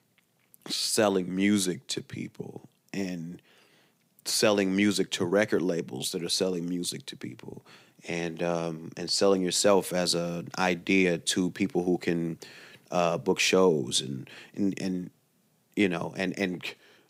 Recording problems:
none

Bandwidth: 15.5 kHz